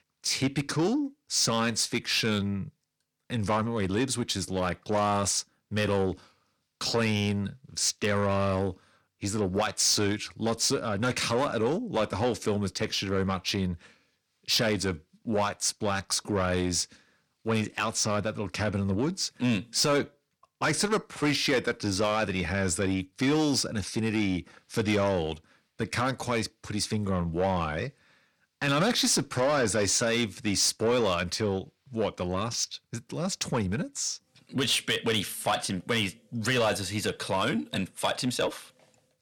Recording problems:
distortion; slight; 10 dB below the speech

